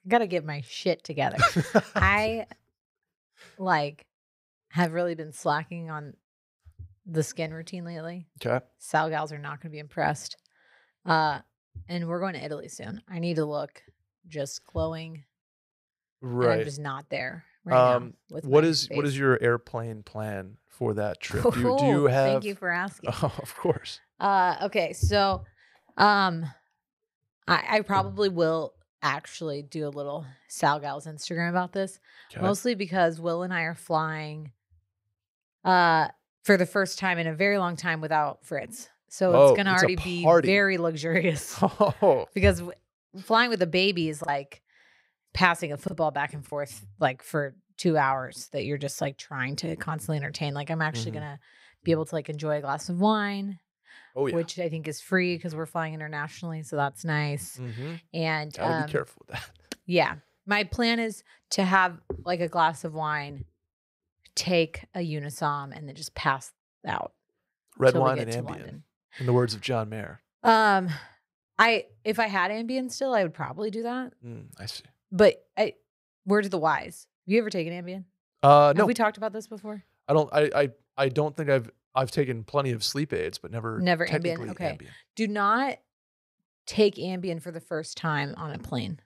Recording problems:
choppy; very; from 44 to 47 s; 6% of the speech affected

